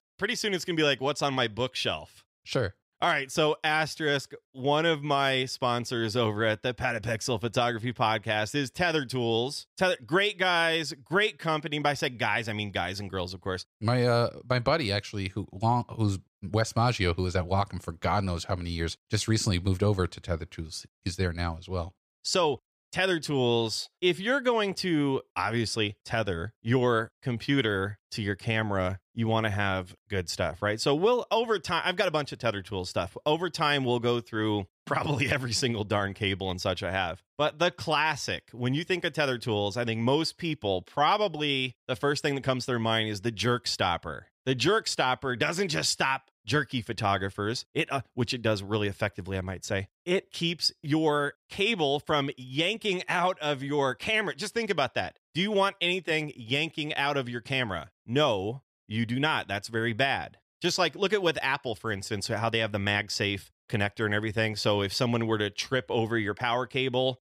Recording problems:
none

